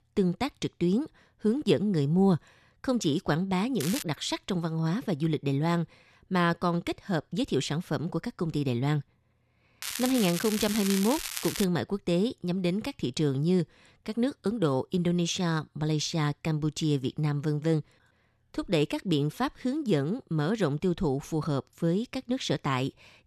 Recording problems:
crackling; loud; at 4 s and from 10 to 12 s; 5 dB below the speech

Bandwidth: 13.5 kHz